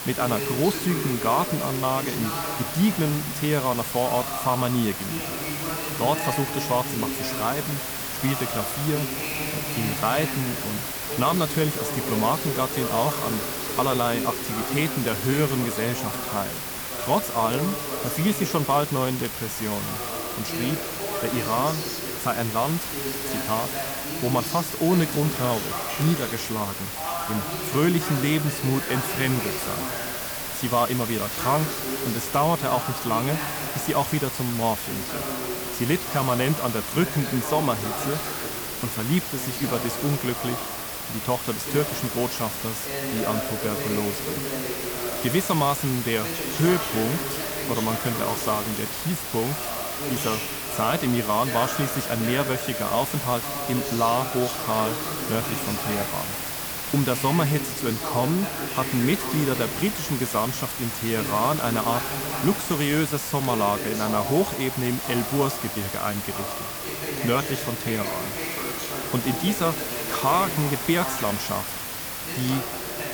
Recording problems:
voice in the background; loud; throughout; 7 dB below the speech
hiss; loud; throughout; 3 dB below the speech
high-pitched whine; very faint; throughout; 2.5 kHz, 35 dB below the speech
crackle, like an old record; very faint; 25 dB below the speech

